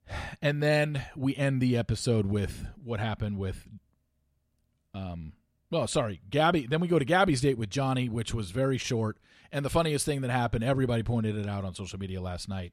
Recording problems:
none

